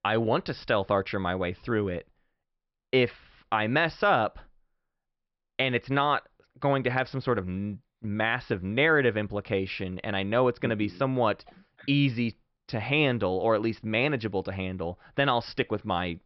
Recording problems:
high frequencies cut off; noticeable; nothing above 5.5 kHz

